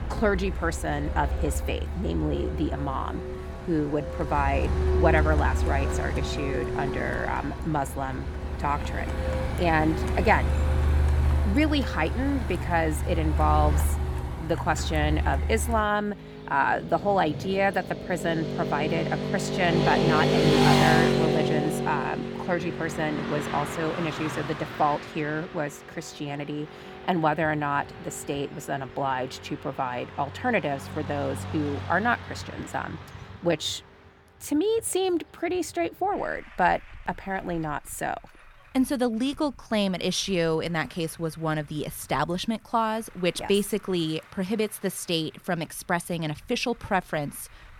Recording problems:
traffic noise; loud; throughout; 1 dB below the speech

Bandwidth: 18 kHz